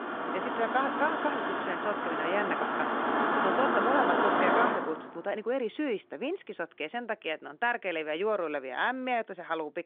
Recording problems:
phone-call audio; nothing above 3.5 kHz
traffic noise; very loud; throughout; 3 dB above the speech

